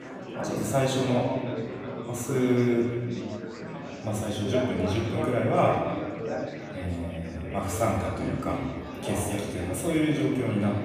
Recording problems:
off-mic speech; far
room echo; noticeable; dies away in 1.5 s
chatter from many people; loud; throughout; 7 dB below the speech

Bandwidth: 15 kHz